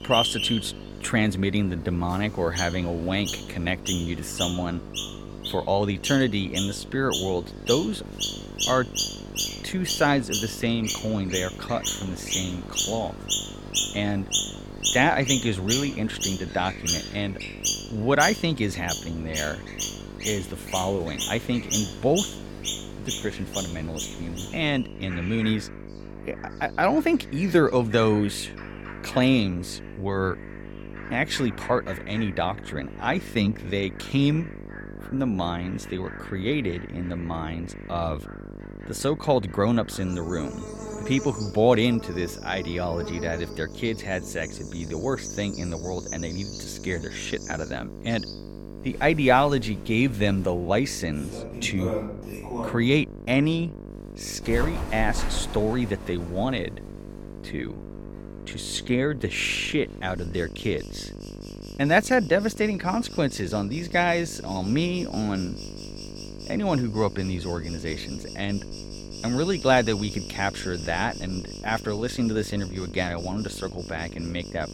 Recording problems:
animal sounds; loud; throughout; 6 dB below the speech
electrical hum; noticeable; throughout; 50 Hz, 20 dB below the speech

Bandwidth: 17 kHz